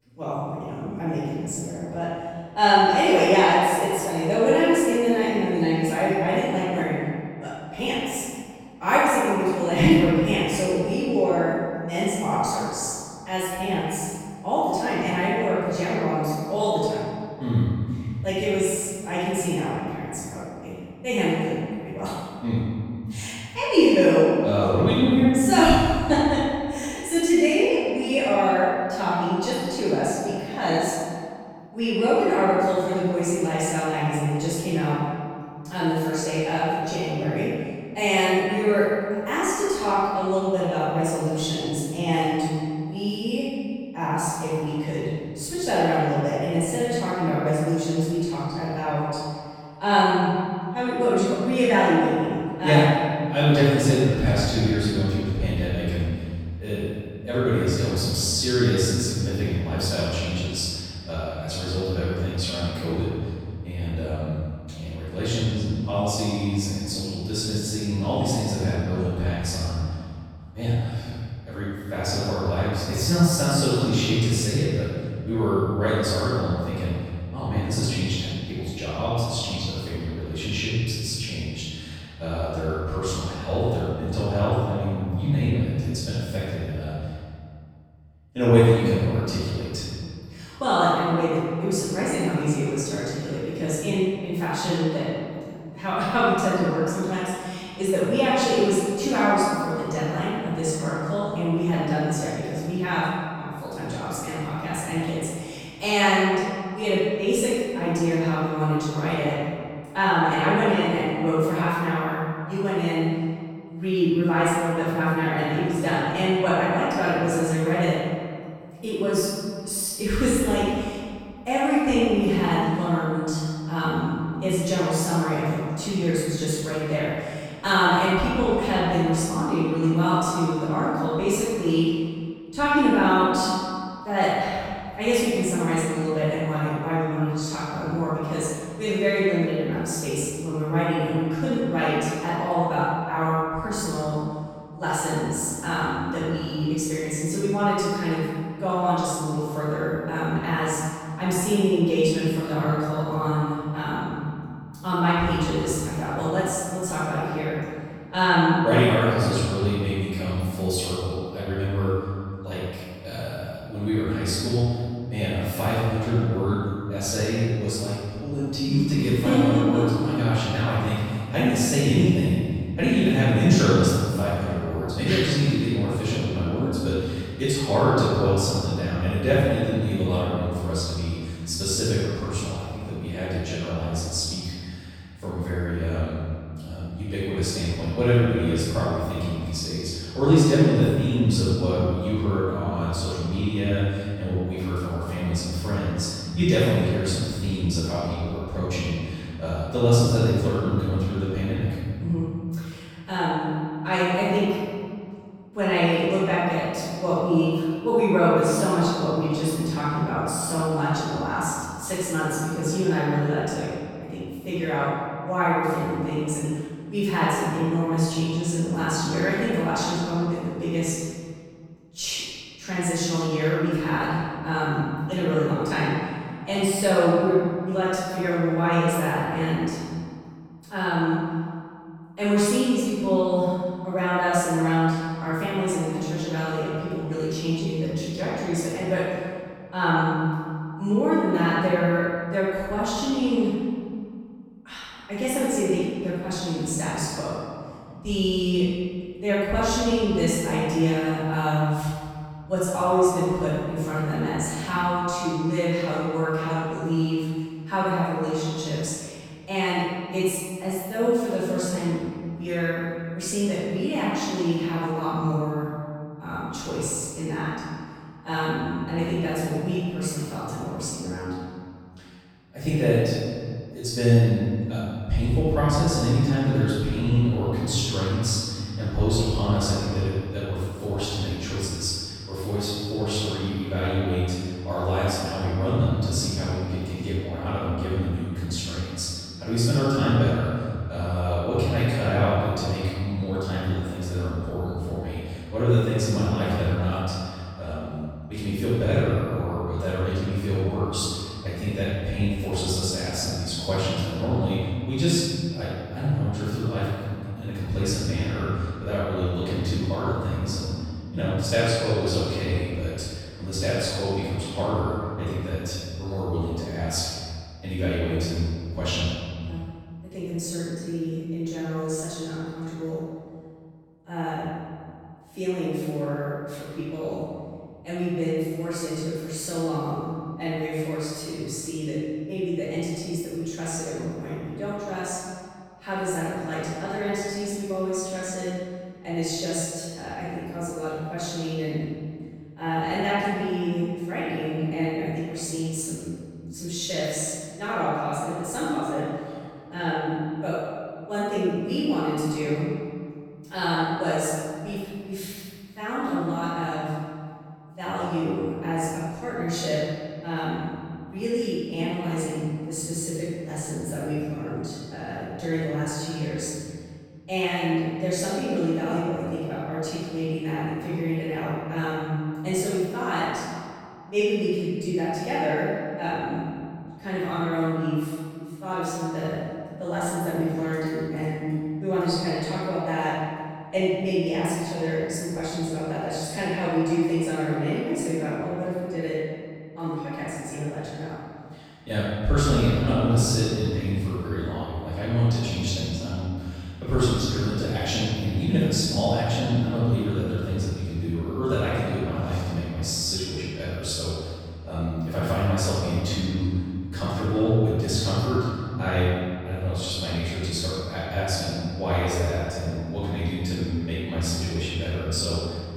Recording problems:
room echo; strong; dies away in 1.9 s
off-mic speech; far

